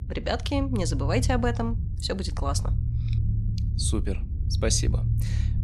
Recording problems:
low rumble; noticeable; throughout; 15 dB below the speech

